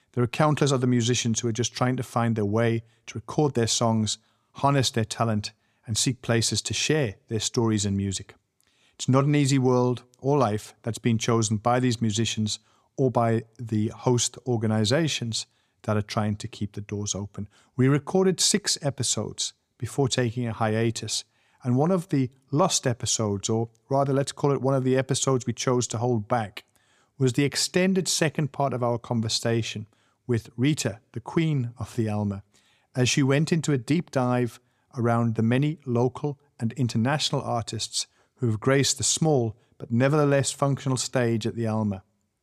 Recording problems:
none

